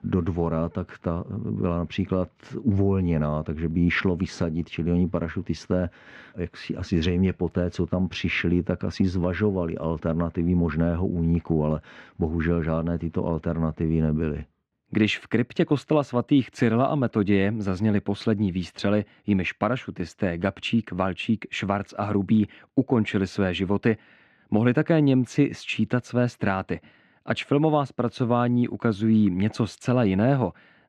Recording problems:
muffled; slightly; fading above 2.5 kHz

